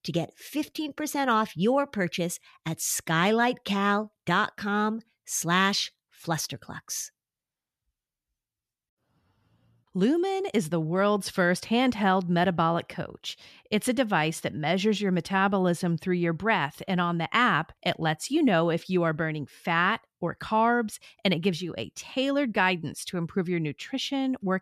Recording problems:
none

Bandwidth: 14 kHz